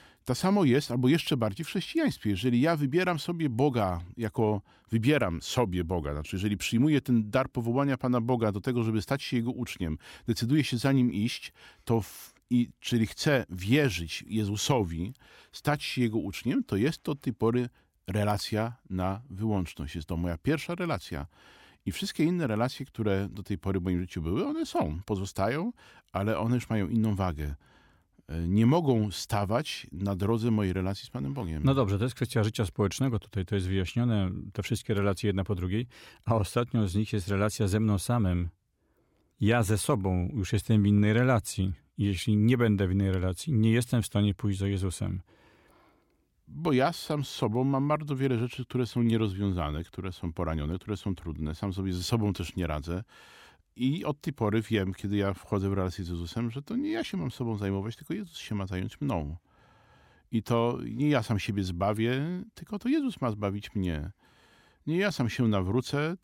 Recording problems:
none

